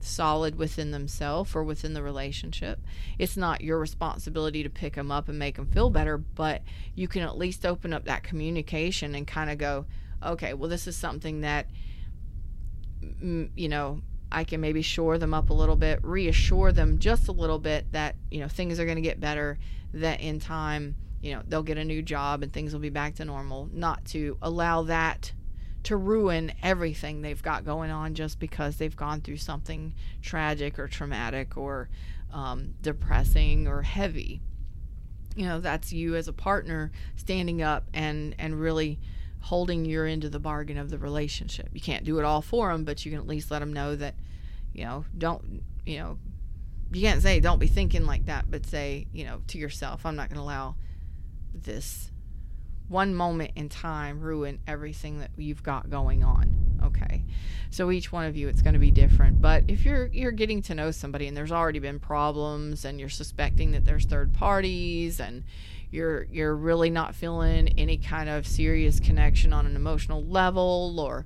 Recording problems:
wind noise on the microphone; occasional gusts; 20 dB below the speech

